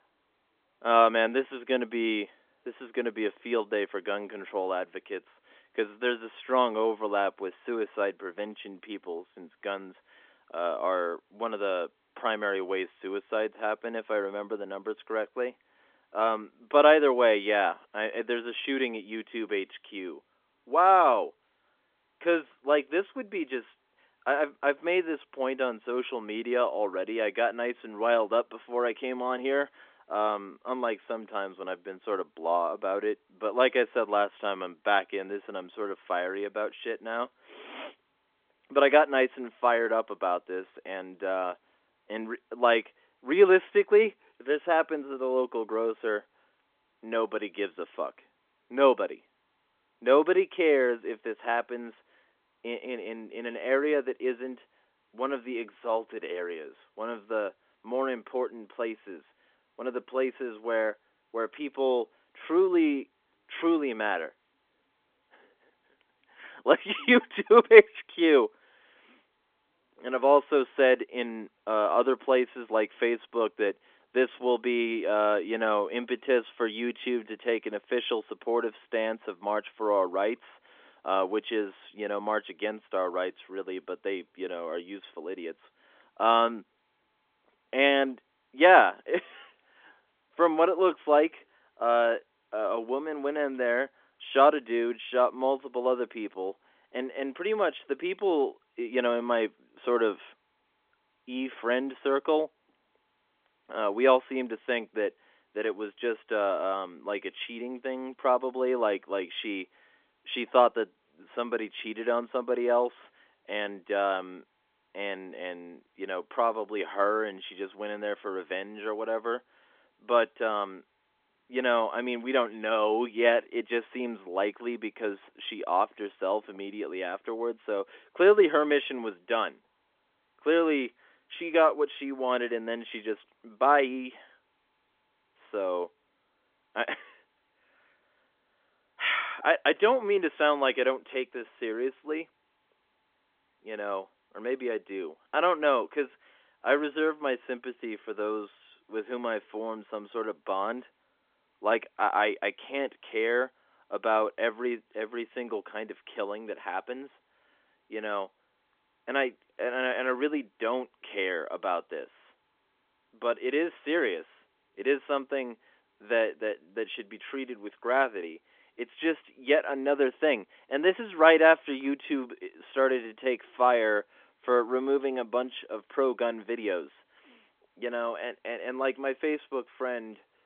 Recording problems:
phone-call audio; nothing above 3.5 kHz

